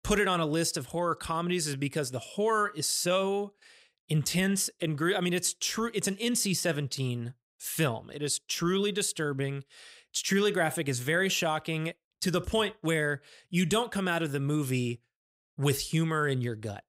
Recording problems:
none

